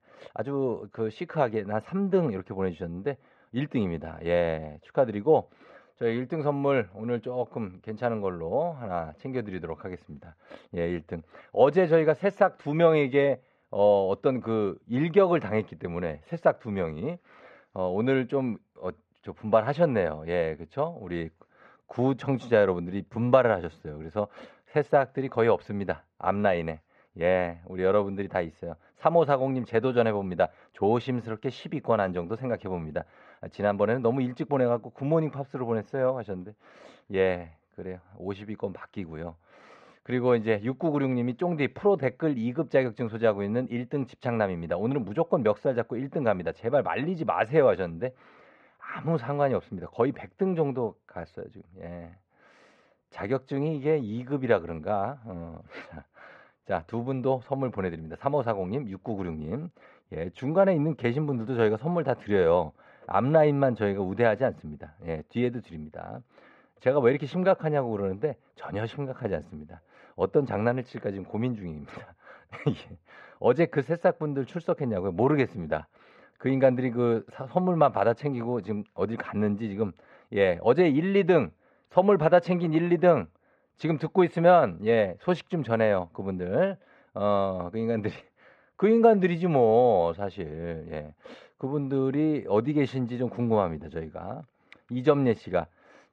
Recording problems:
muffled; very; fading above 2 kHz

